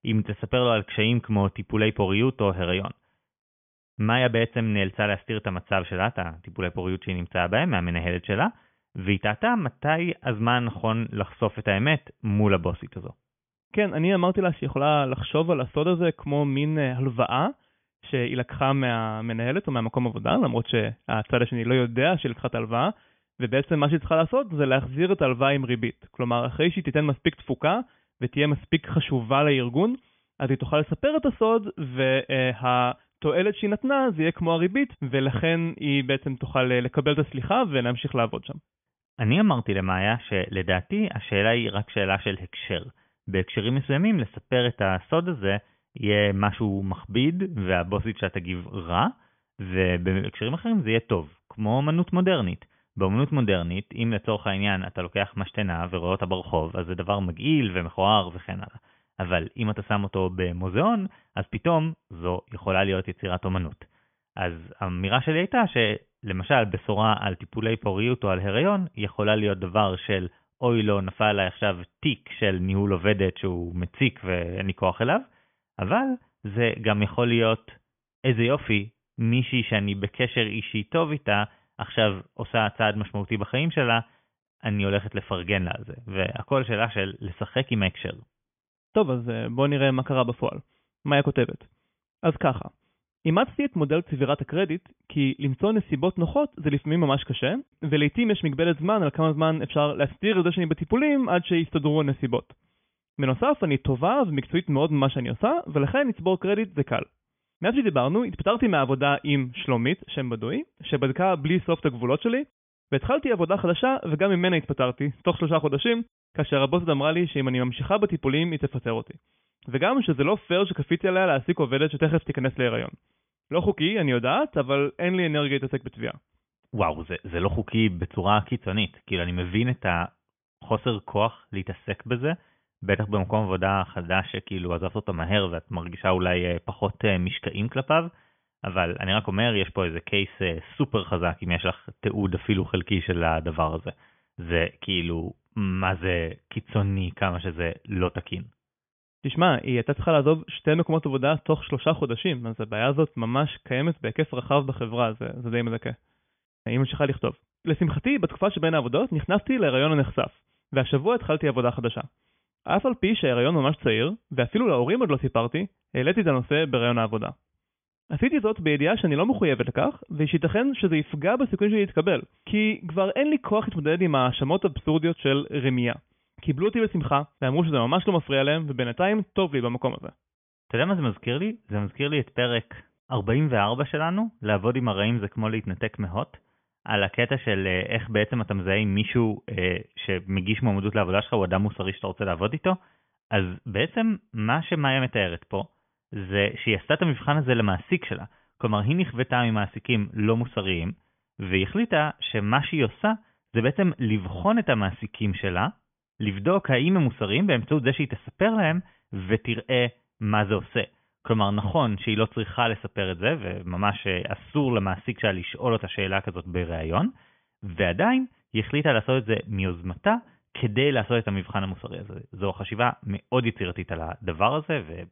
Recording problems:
high frequencies cut off; severe; nothing above 3.5 kHz

